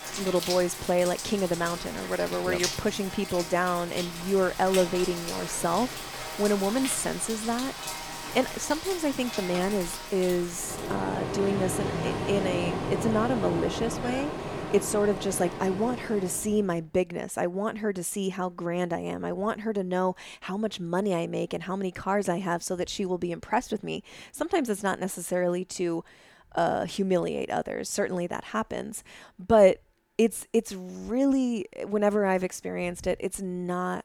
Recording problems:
rain or running water; loud; until 16 s; 6 dB below the speech

